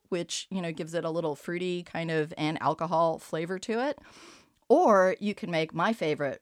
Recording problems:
none

